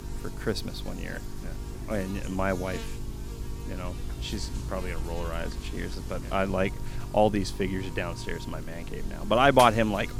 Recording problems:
electrical hum; noticeable; throughout; 50 Hz, 15 dB below the speech

